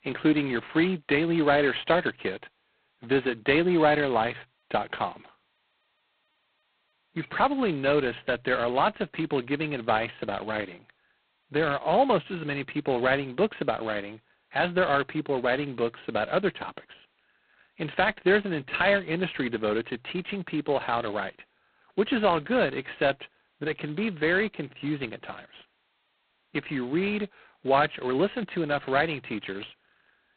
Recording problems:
phone-call audio; poor line; nothing above 4 kHz

